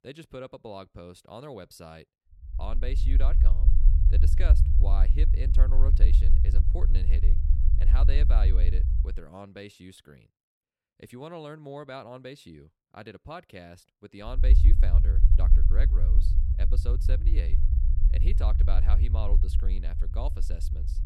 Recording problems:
low rumble; loud; from 2.5 to 9 s and from 14 s on; 4 dB below the speech

